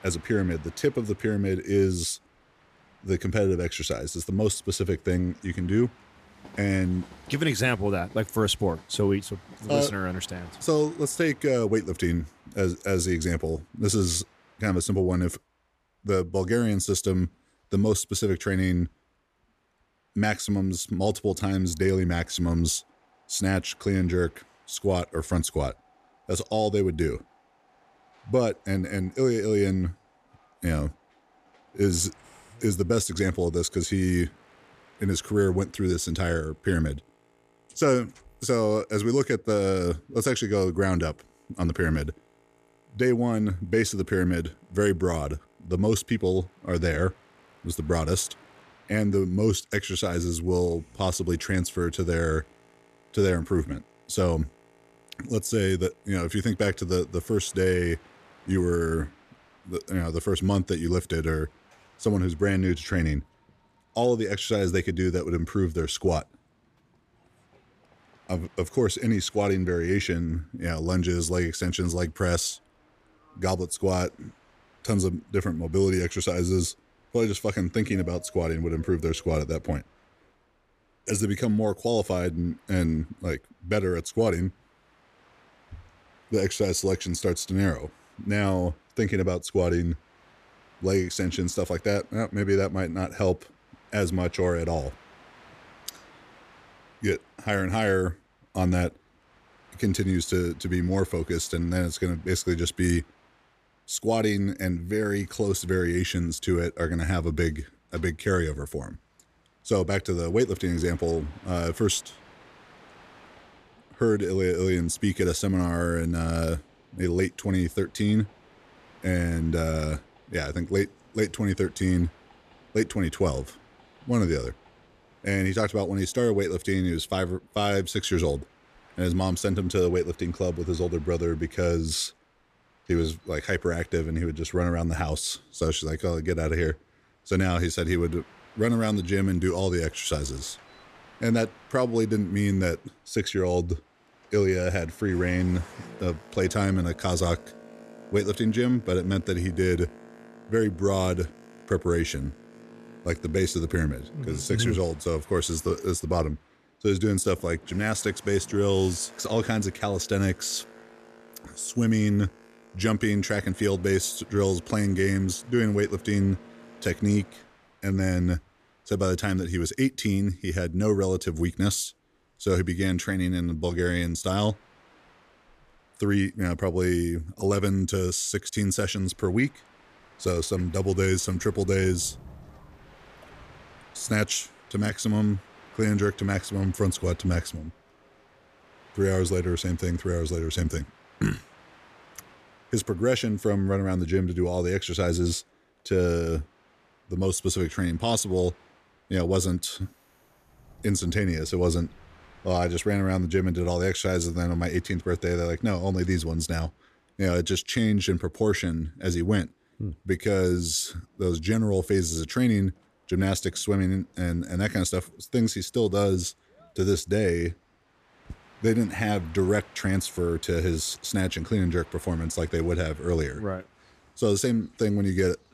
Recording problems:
train or aircraft noise; faint; throughout; 25 dB below the speech

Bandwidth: 14.5 kHz